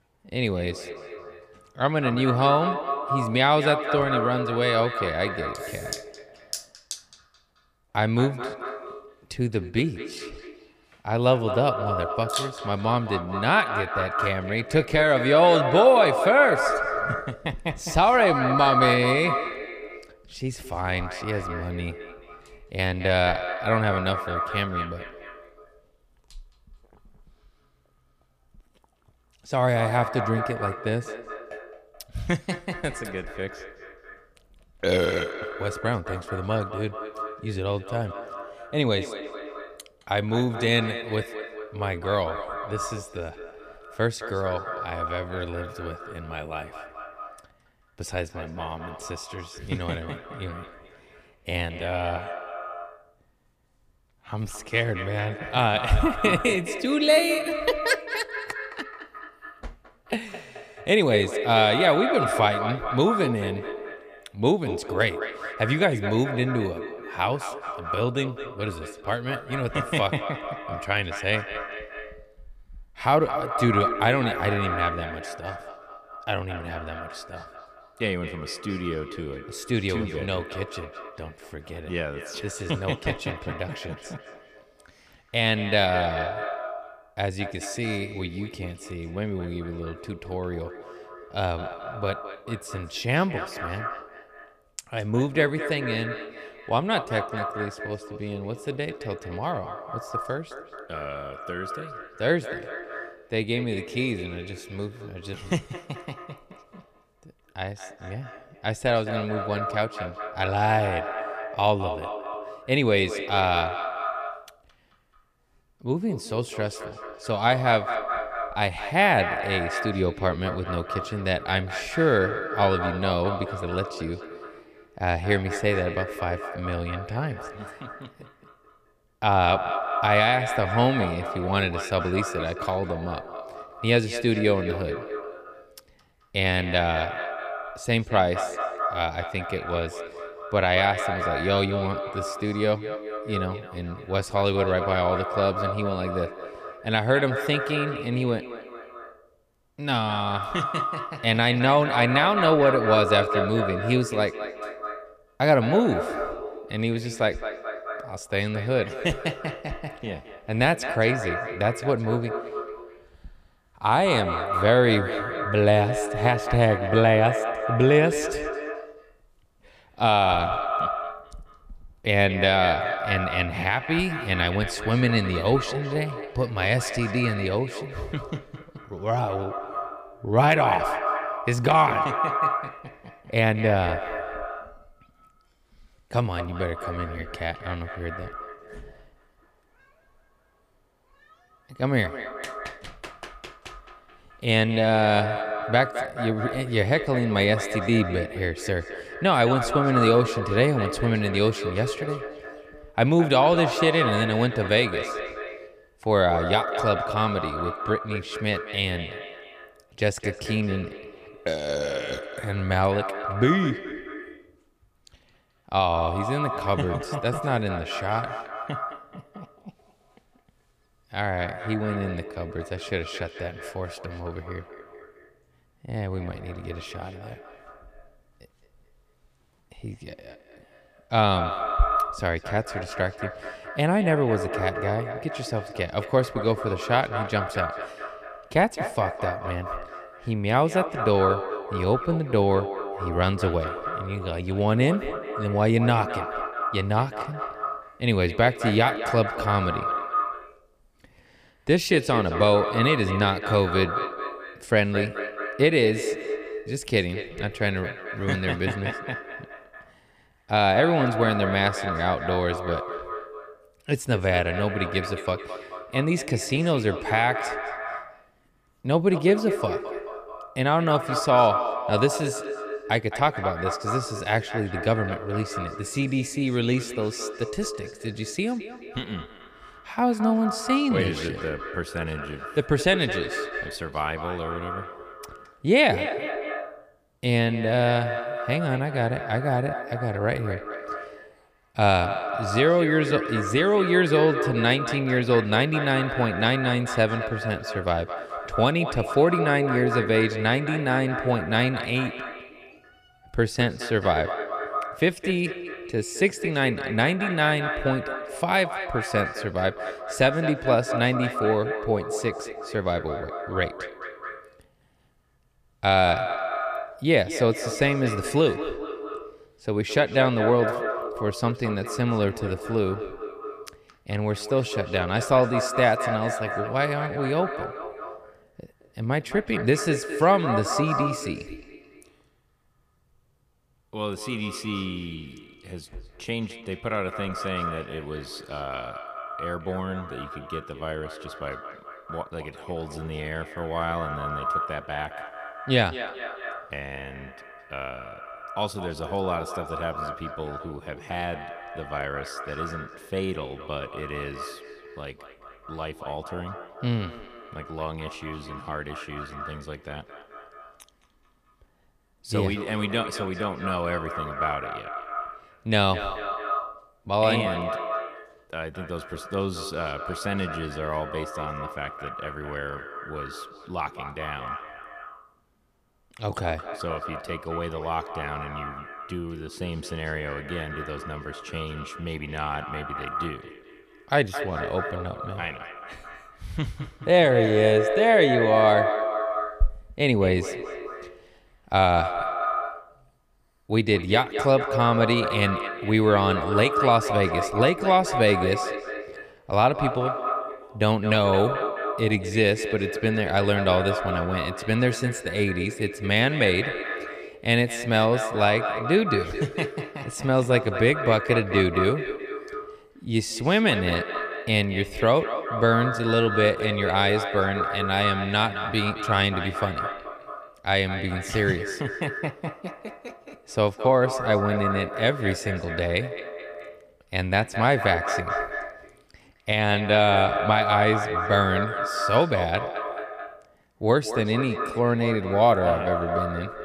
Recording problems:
echo of what is said; strong; throughout; 220 ms later, 6 dB below the speech

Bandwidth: 15 kHz